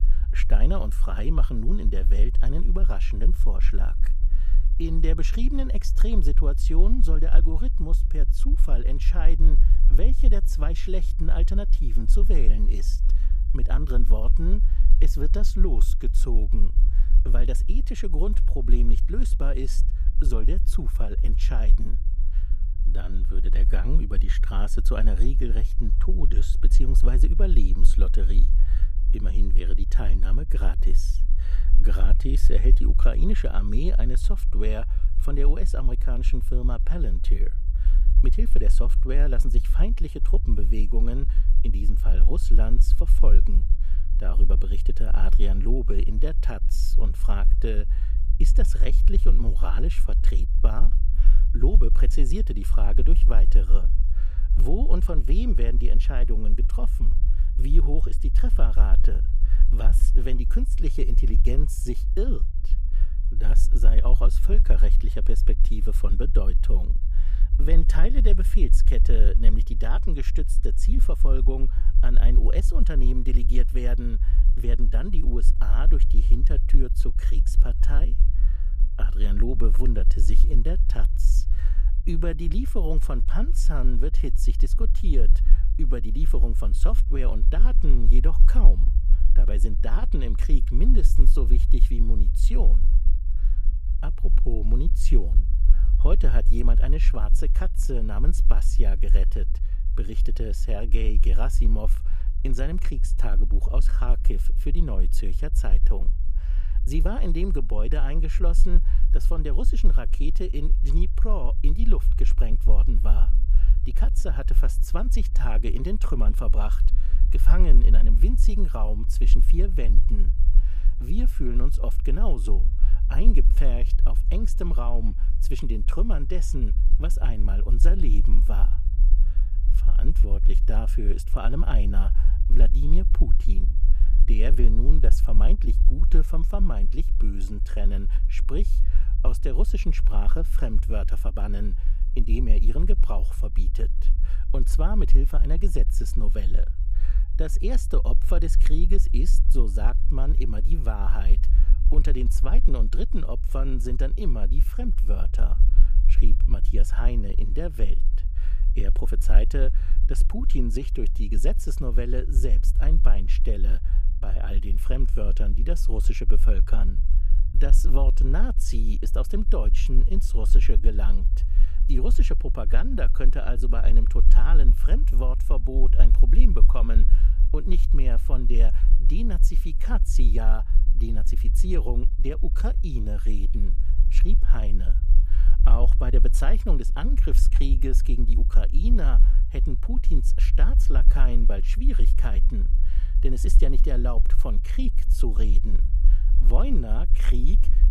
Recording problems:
low rumble; noticeable; throughout; 10 dB below the speech

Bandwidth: 15 kHz